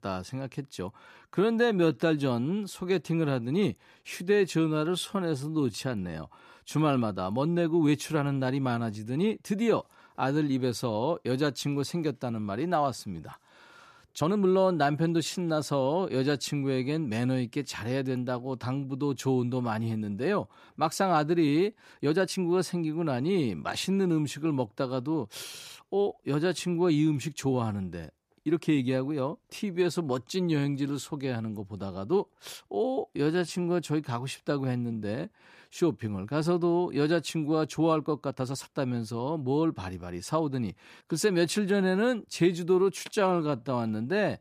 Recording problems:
uneven, jittery; strongly; from 1 to 44 s

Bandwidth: 14.5 kHz